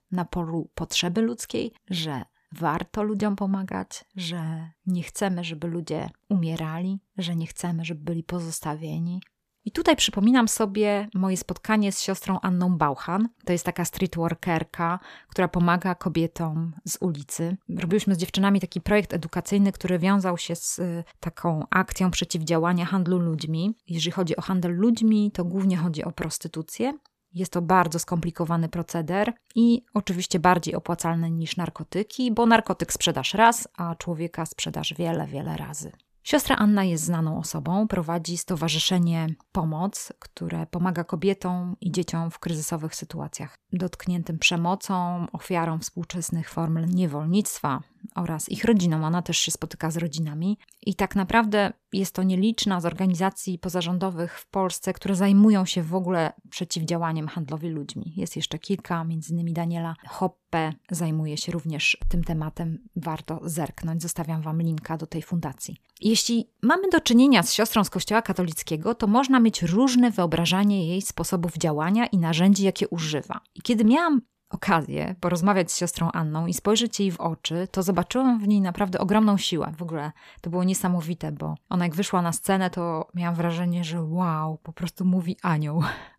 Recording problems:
none

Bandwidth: 14.5 kHz